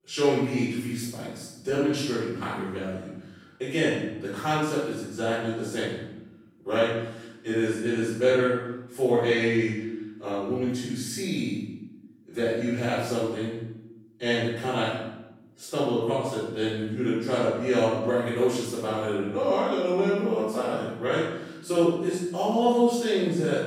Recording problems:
room echo; strong; dies away in 0.9 s
off-mic speech; far

